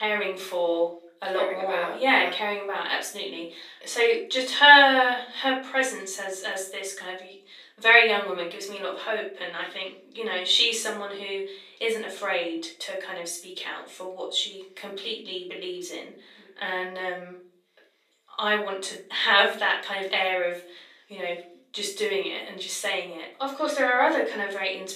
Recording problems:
off-mic speech; far
thin; very; fading below 300 Hz
room echo; slight; dies away in 0.4 s
abrupt cut into speech; at the start

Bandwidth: 14.5 kHz